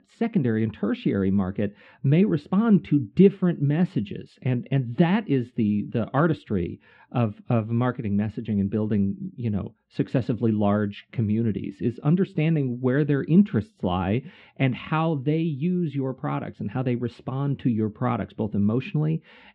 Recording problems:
muffled; very; fading above 3 kHz

